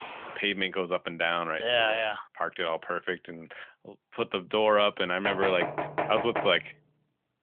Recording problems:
phone-call audio; nothing above 3.5 kHz
footsteps; faint; at the start; peak 15 dB below the speech
door banging; noticeable; from 5.5 to 6.5 s; peak 3 dB below the speech

